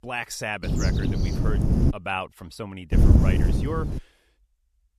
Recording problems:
wind noise on the microphone; heavy; from 0.5 to 2 s and from 3 to 4 s; 1 dB below the speech

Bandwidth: 14 kHz